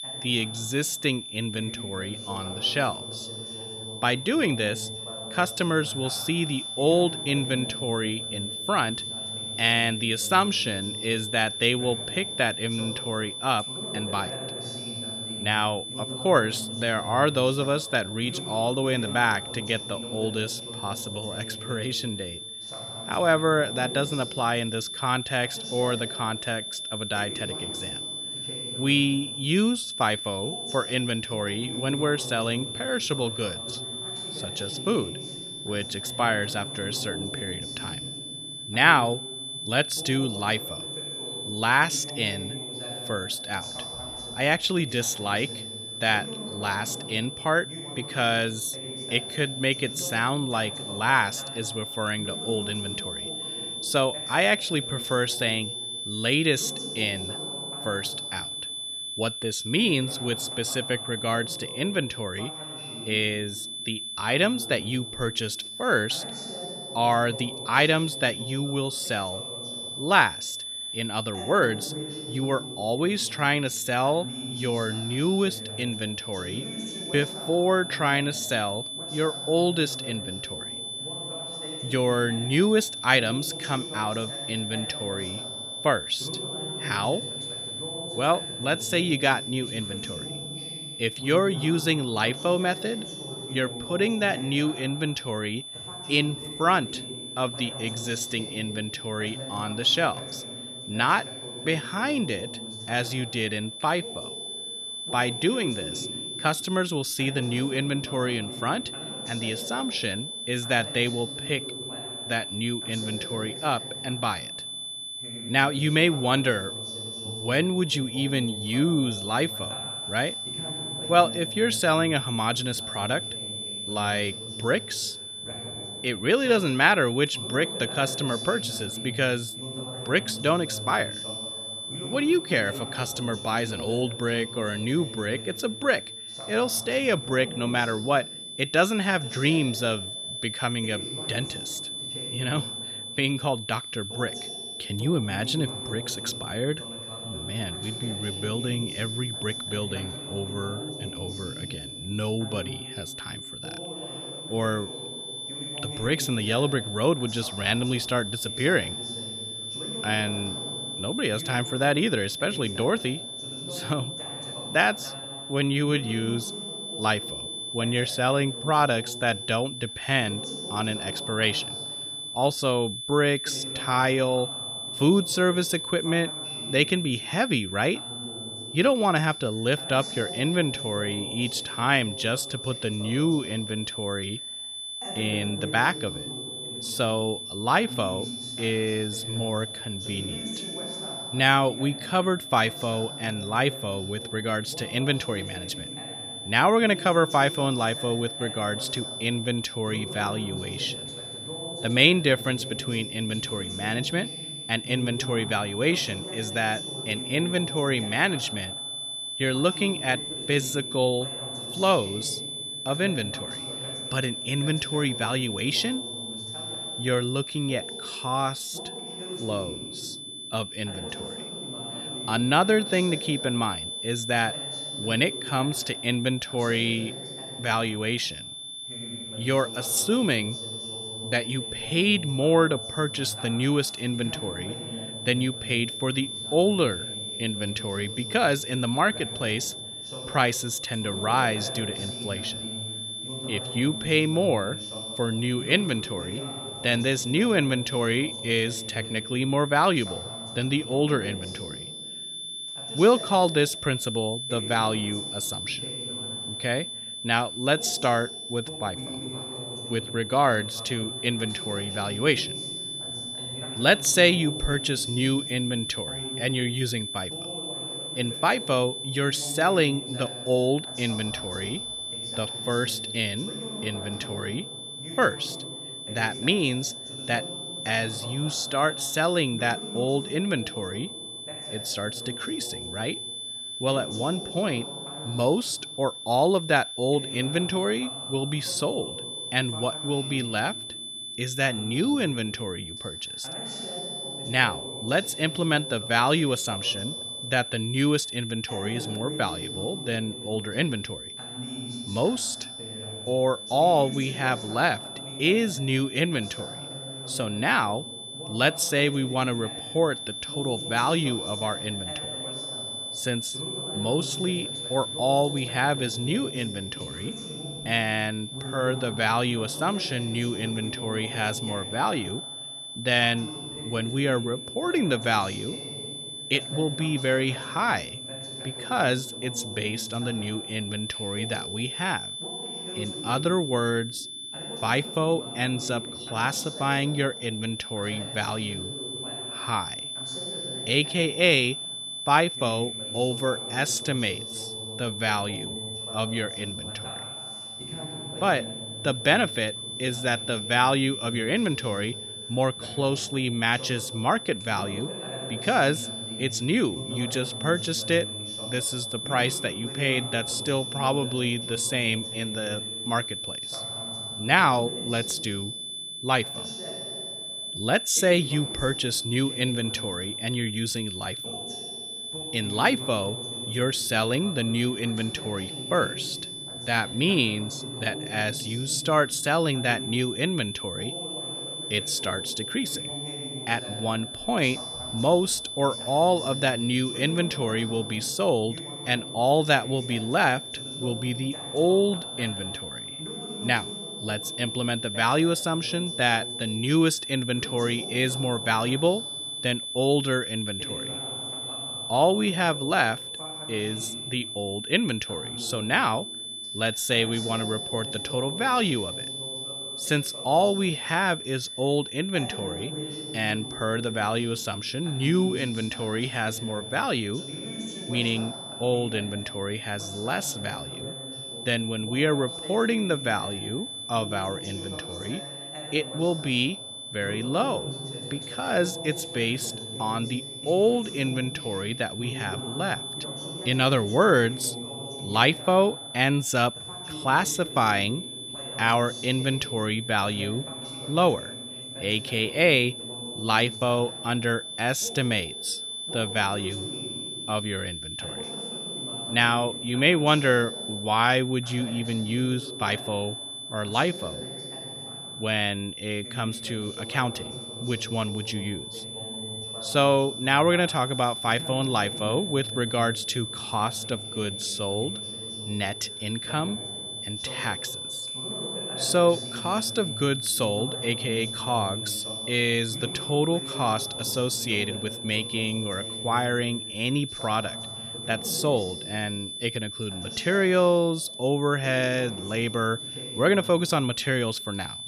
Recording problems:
high-pitched whine; loud; throughout; 3.5 kHz, 7 dB below the speech
voice in the background; noticeable; throughout; 15 dB below the speech

